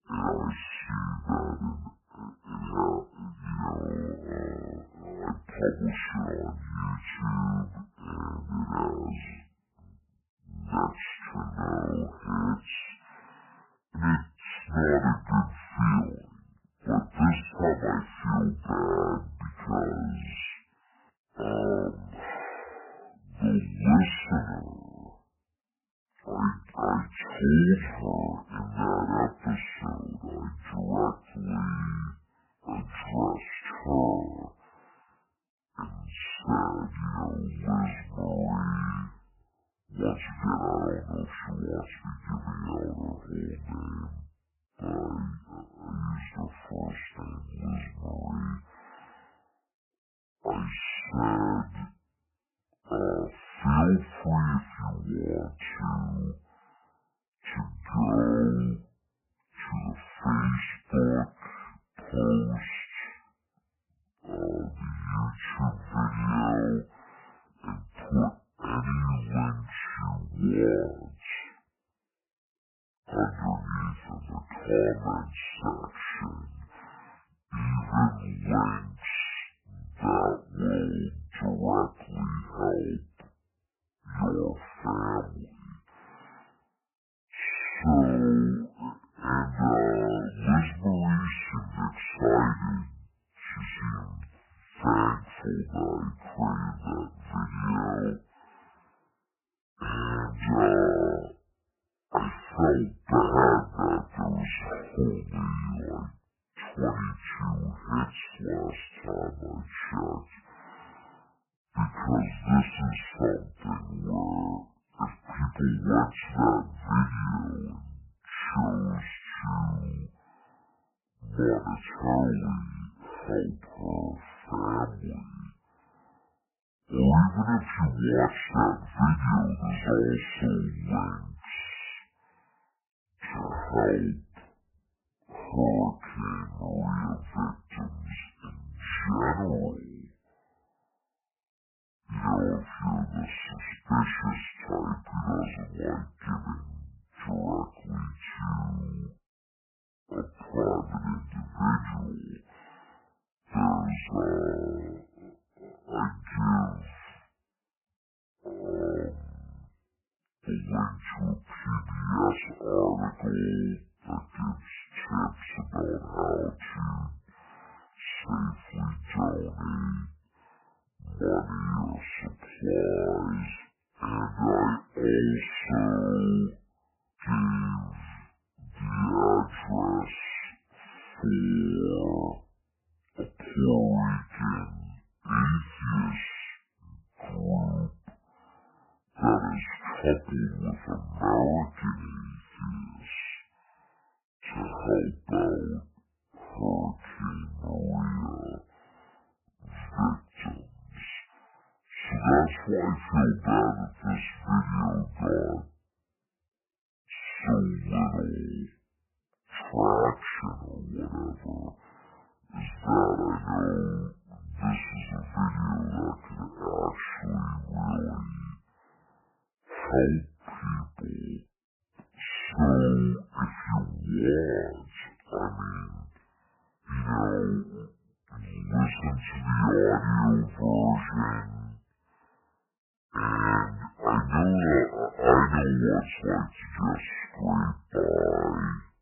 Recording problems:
garbled, watery; badly; nothing above 3 kHz
wrong speed and pitch; too slow and too low; 0.5 times normal speed

